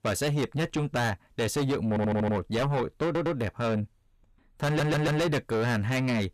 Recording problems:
distortion; heavy; 6 dB below the speech
audio stuttering; at 2 s, at 3 s and at 4.5 s

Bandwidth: 15 kHz